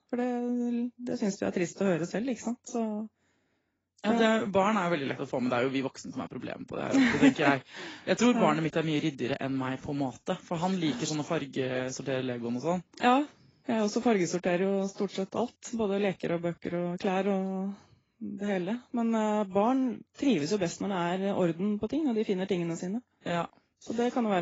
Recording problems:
garbled, watery; badly; nothing above 7.5 kHz
abrupt cut into speech; at the end

